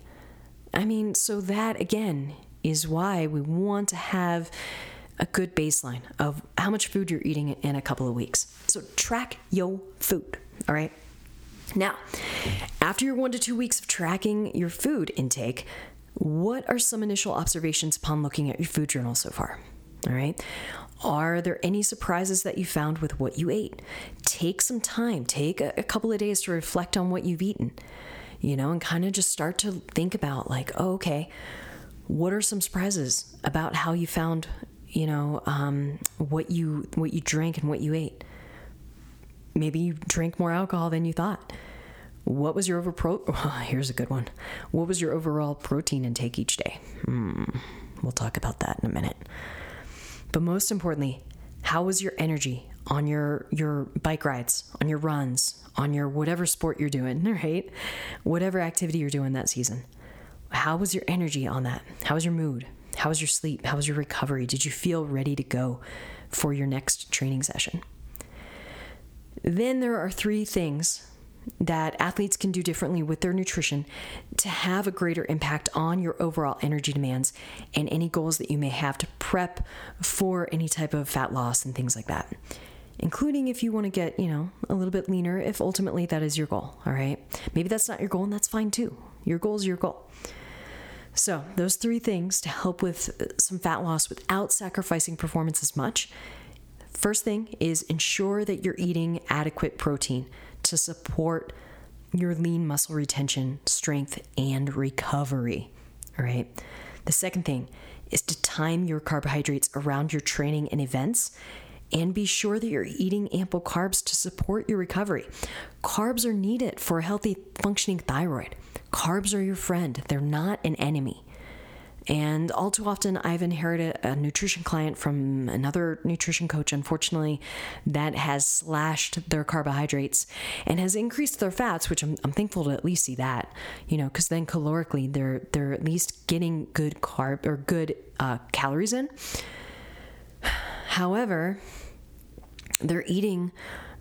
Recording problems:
squashed, flat; somewhat

